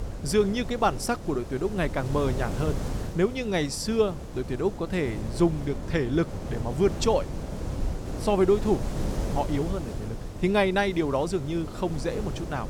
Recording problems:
wind noise on the microphone; occasional gusts; 10 dB below the speech

